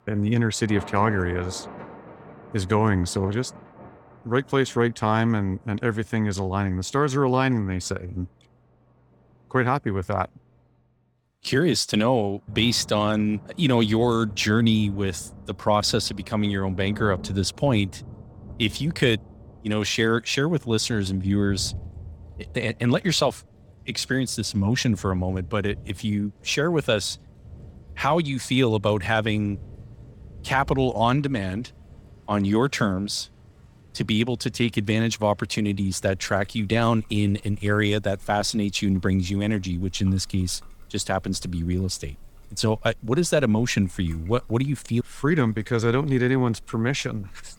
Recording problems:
rain or running water; faint; throughout; 20 dB below the speech

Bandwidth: 18.5 kHz